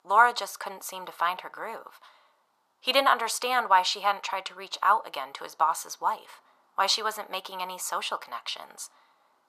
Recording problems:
thin; very; fading below 750 Hz

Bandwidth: 14.5 kHz